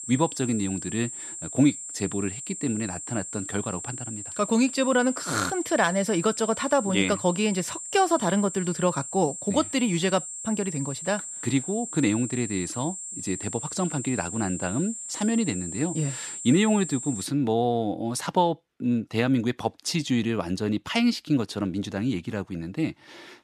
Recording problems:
high-pitched whine; loud; until 17 s; 7.5 kHz, 8 dB below the speech

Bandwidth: 13.5 kHz